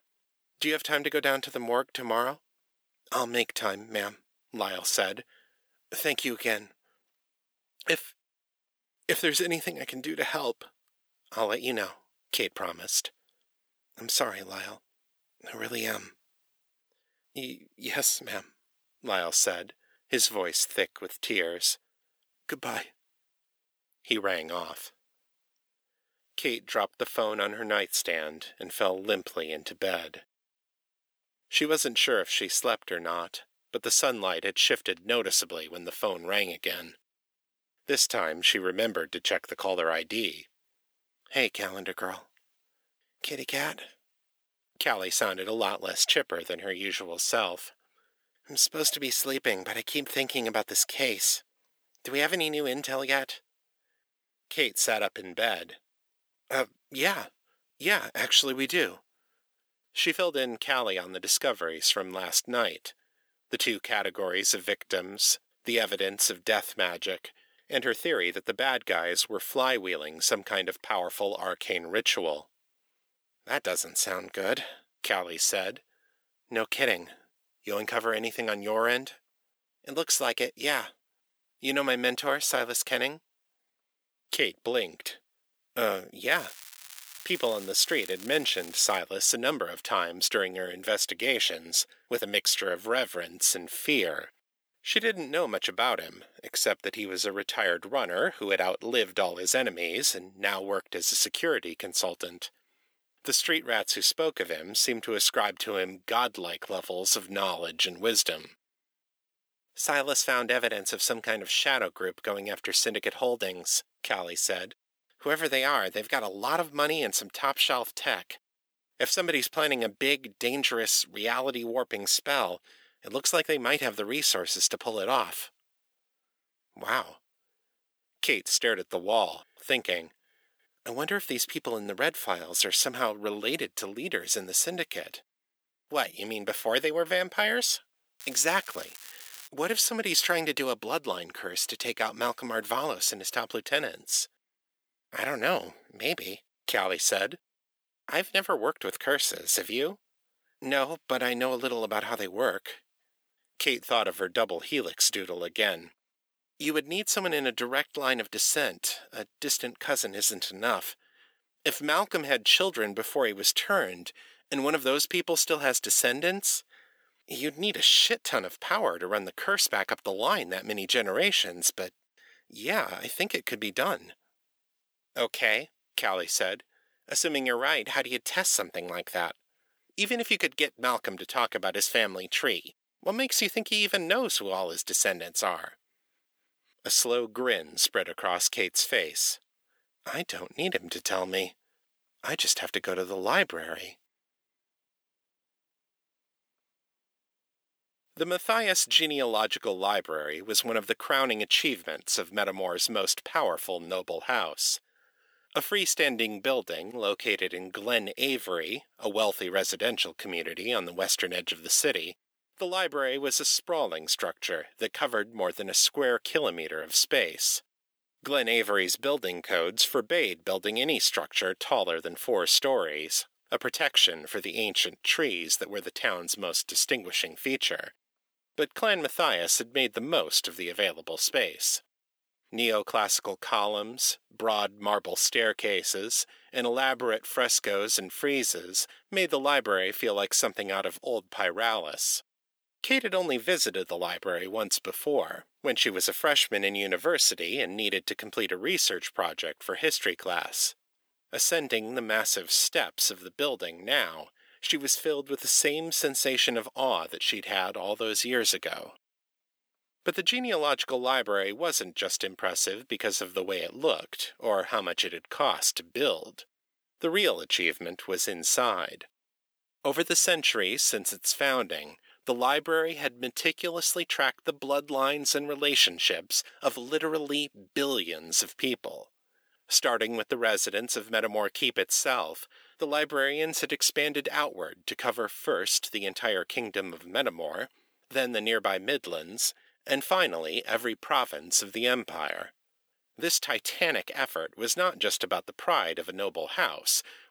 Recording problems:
thin; somewhat; fading below 350 Hz
crackling; noticeable; from 1:26 to 1:29 and from 2:18 to 2:19; 15 dB below the speech

